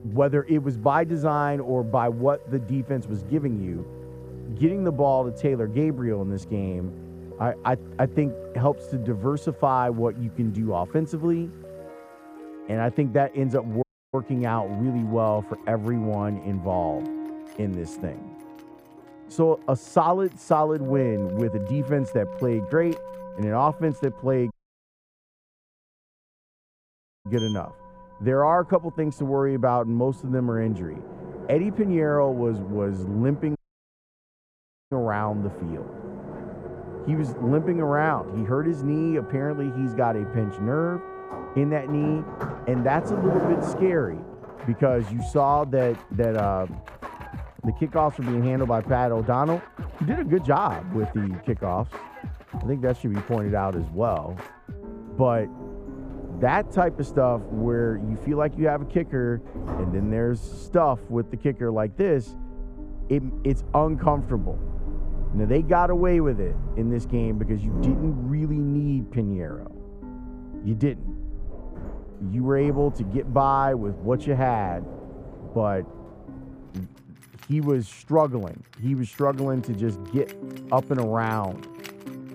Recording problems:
muffled; very; fading above 2.5 kHz
household noises; noticeable; throughout; 10 dB below the speech
background music; noticeable; throughout; 15 dB below the speech
audio cutting out; at 14 s, at 25 s for 2.5 s and at 34 s for 1.5 s

